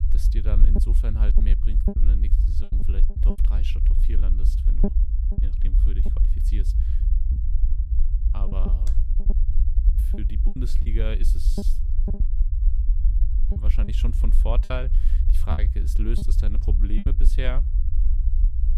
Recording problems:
low rumble; loud; throughout; 4 dB below the speech
choppy; very; 7% of the speech affected

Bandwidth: 15.5 kHz